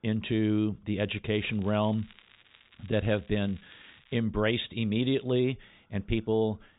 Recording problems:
high frequencies cut off; severe; nothing above 4 kHz
crackling; faint; from 1.5 to 4 s; 25 dB below the speech

